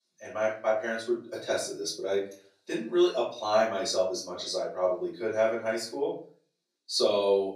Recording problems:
off-mic speech; far
thin; very; fading below 300 Hz
room echo; slight; dies away in 0.4 s

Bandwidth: 14.5 kHz